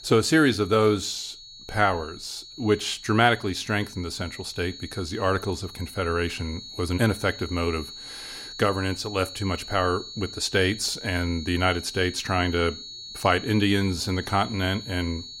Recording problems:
high-pitched whine; noticeable; throughout; 4.5 kHz, 15 dB below the speech

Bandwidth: 16 kHz